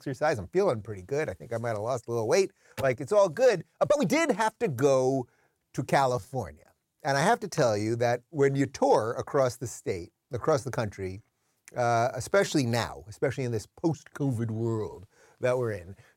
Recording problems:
uneven, jittery; strongly; from 0.5 to 15 s

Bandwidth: 16.5 kHz